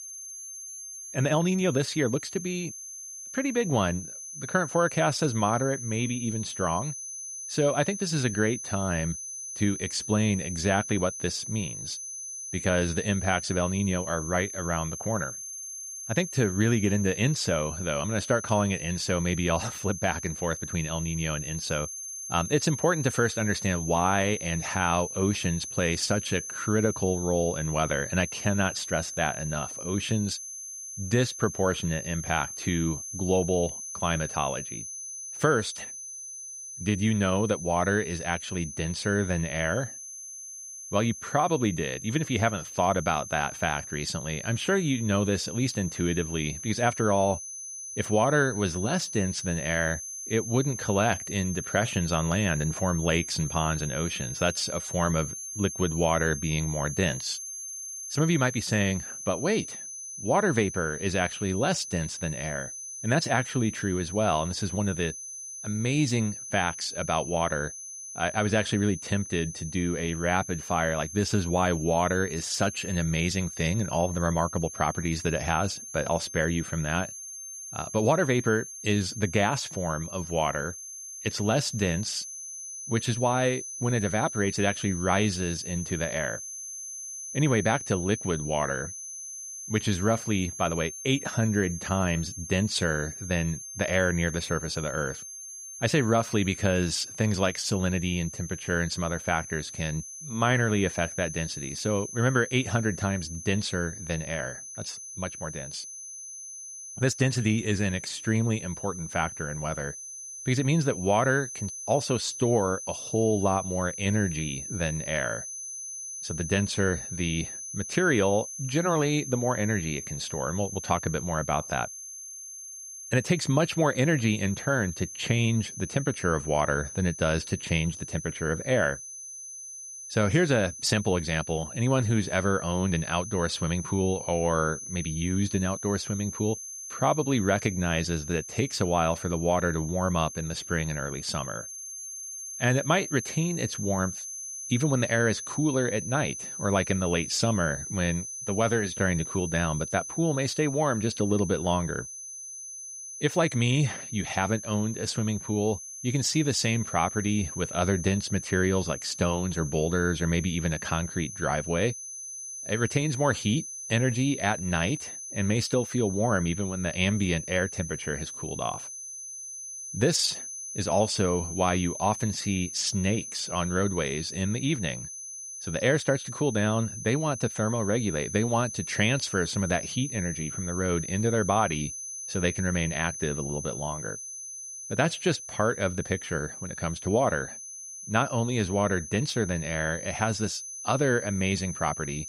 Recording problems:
high-pitched whine; loud; throughout; 6 kHz, 8 dB below the speech

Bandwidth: 15.5 kHz